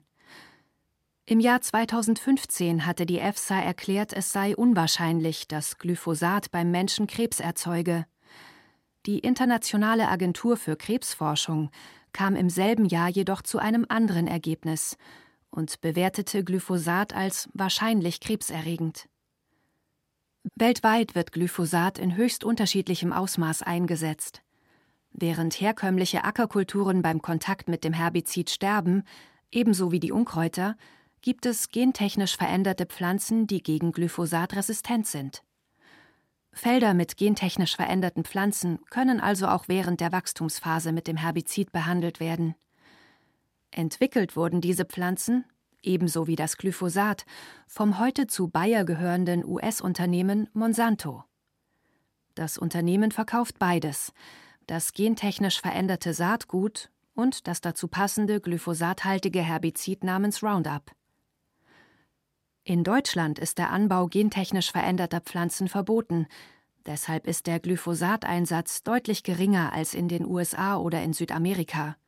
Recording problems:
none

